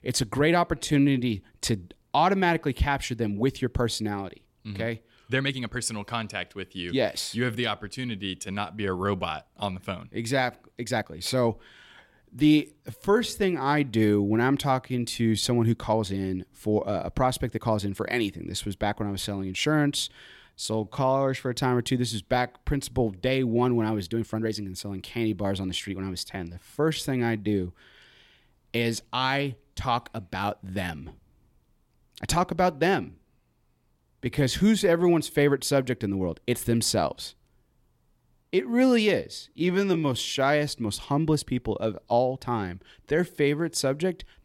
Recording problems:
uneven, jittery; strongly; from 0.5 to 44 s

